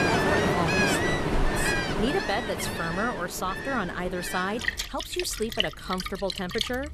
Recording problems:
rain or running water; very loud; throughout; 3 dB above the speech

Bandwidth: 14.5 kHz